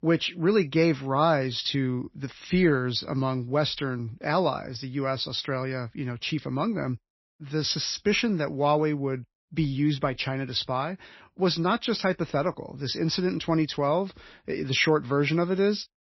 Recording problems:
garbled, watery; slightly; nothing above 5.5 kHz

